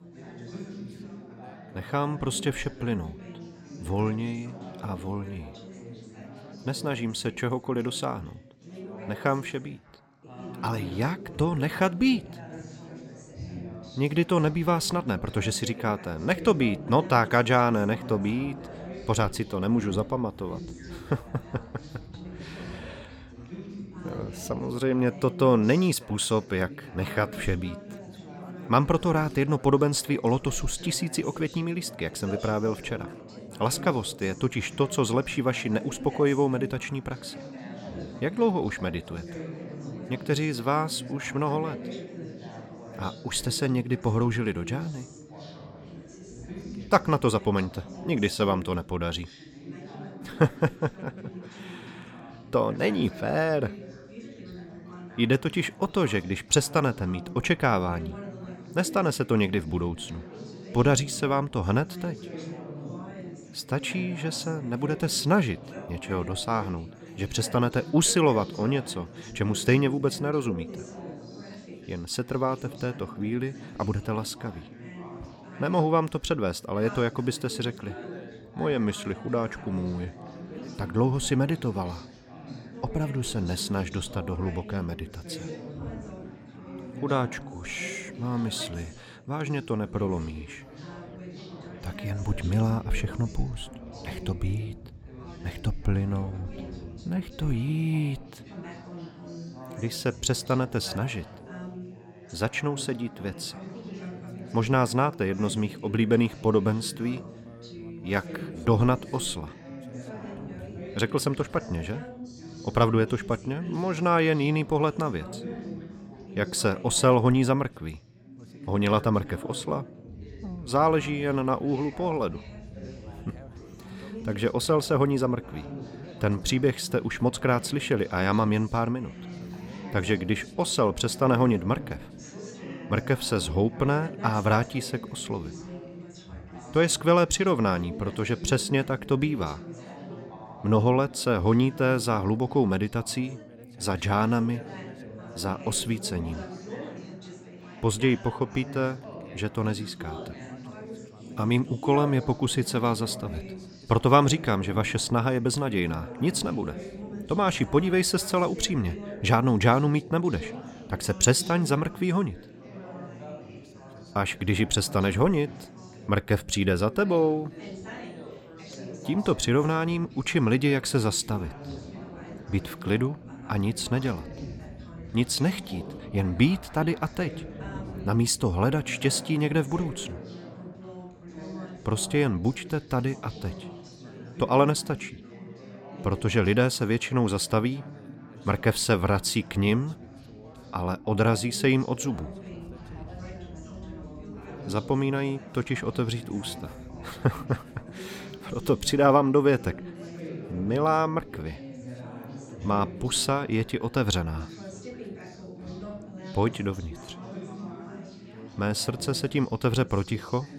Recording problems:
background chatter; noticeable; throughout; 4 voices, 15 dB below the speech

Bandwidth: 17 kHz